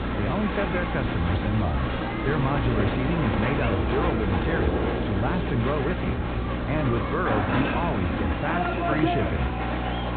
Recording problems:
high frequencies cut off; severe; nothing above 4 kHz
muffled; very slightly; fading above 3 kHz
crowd noise; very loud; throughout; as loud as the speech
electrical hum; loud; throughout; 60 Hz, 9 dB below the speech
hiss; noticeable; throughout; 20 dB below the speech

